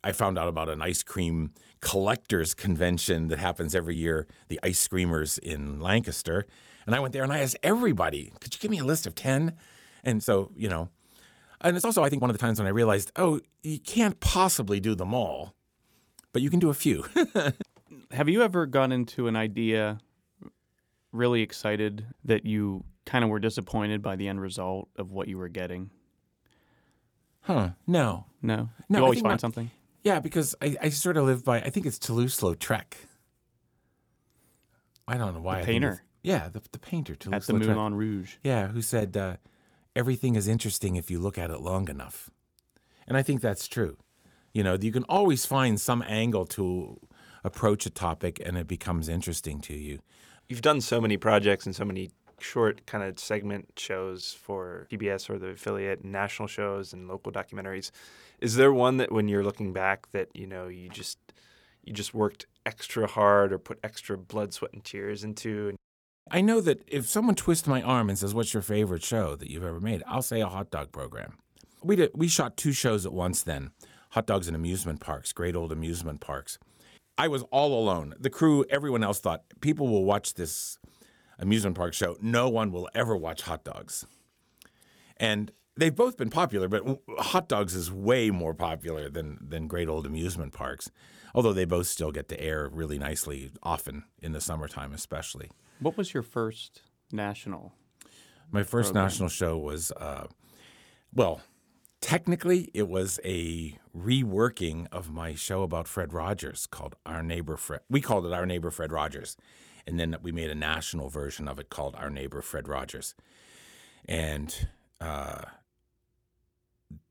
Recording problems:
uneven, jittery; strongly; from 4 s to 1:44

